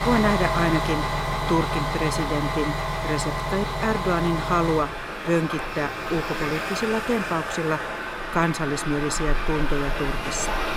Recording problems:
traffic noise; loud; throughout; 1 dB below the speech

